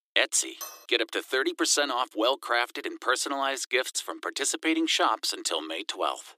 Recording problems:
thin; very; fading below 300 Hz
clattering dishes; faint; at 0.5 s; peak 15 dB below the speech

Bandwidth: 15 kHz